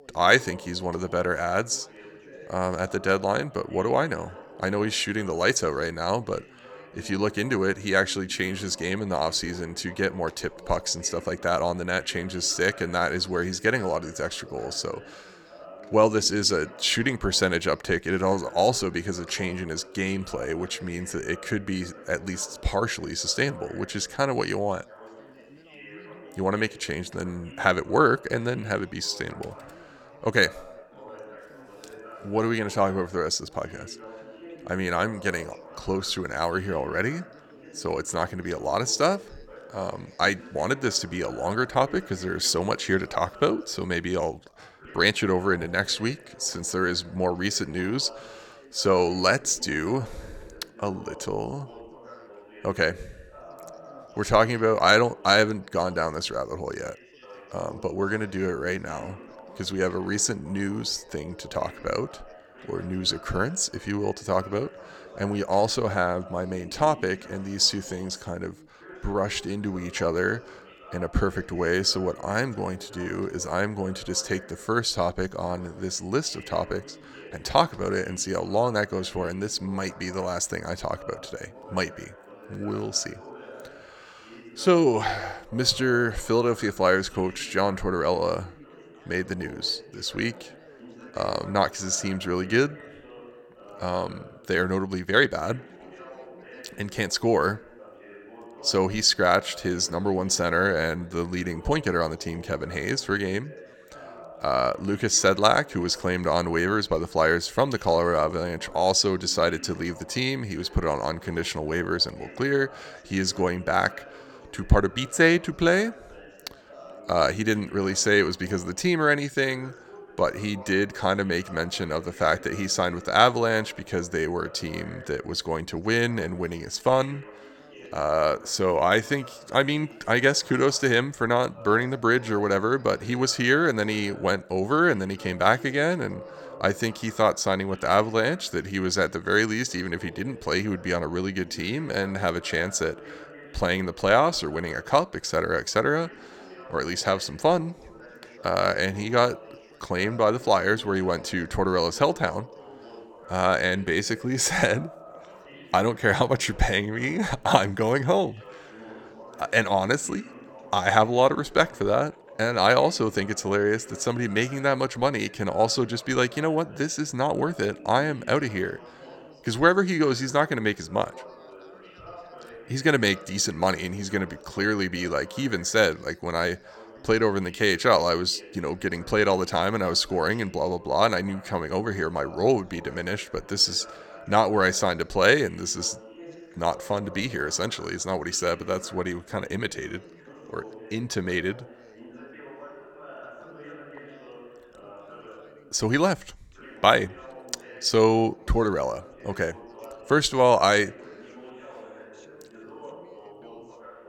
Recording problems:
background chatter; faint; throughout; 2 voices, 20 dB below the speech

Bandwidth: 18 kHz